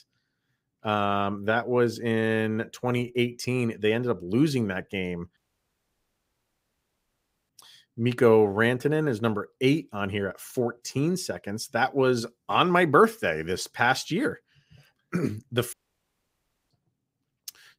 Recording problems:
audio cutting out; at 5.5 s for 2 s and at 16 s for 1 s

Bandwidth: 15.5 kHz